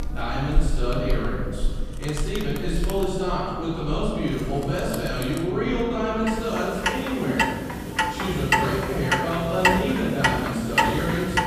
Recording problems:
room echo; strong; dies away in 2 s
off-mic speech; far
household noises; loud; throughout; 1 dB below the speech

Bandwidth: 14.5 kHz